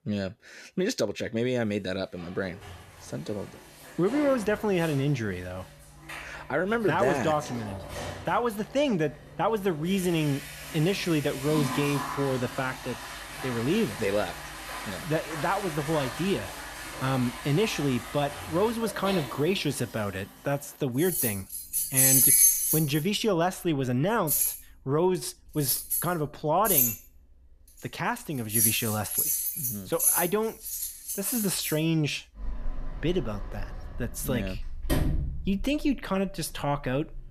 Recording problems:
household noises; very loud; throughout; 1 dB above the speech

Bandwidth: 14.5 kHz